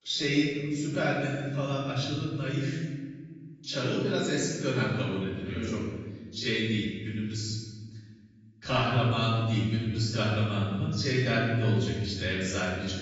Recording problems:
off-mic speech; far
garbled, watery; badly; nothing above 7.5 kHz
room echo; noticeable; dies away in 1.5 s

